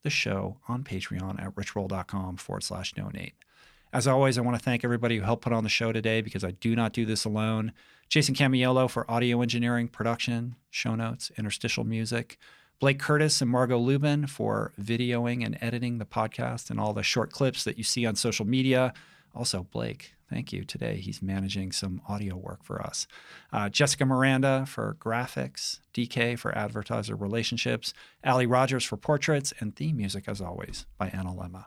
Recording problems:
none

